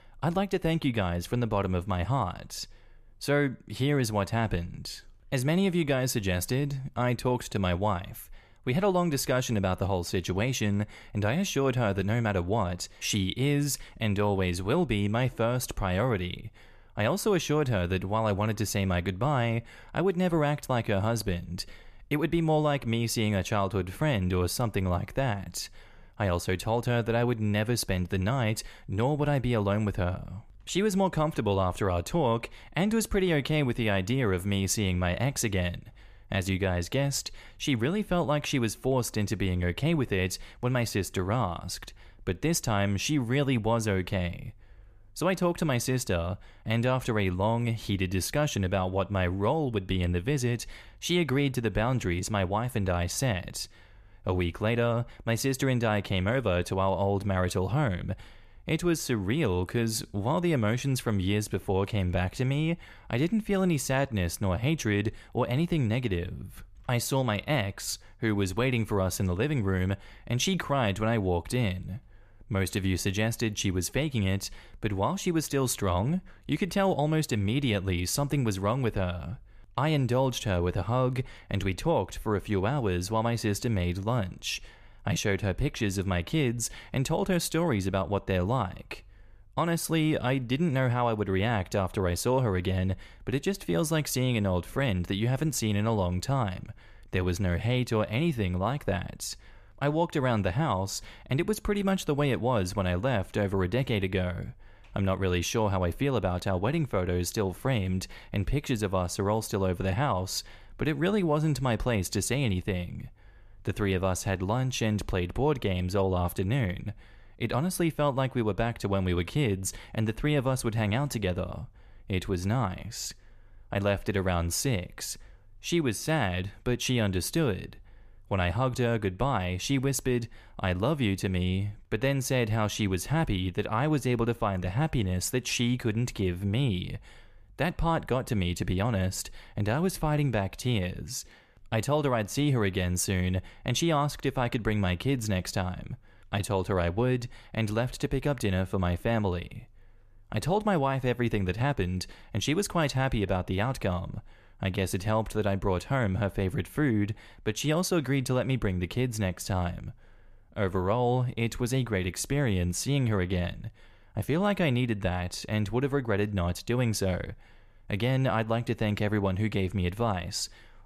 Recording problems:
none

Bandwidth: 14.5 kHz